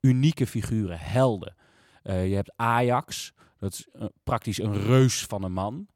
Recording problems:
none

